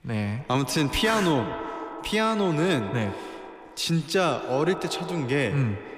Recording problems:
echo of what is said; strong; throughout; 130 ms later, 10 dB below the speech

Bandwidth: 15 kHz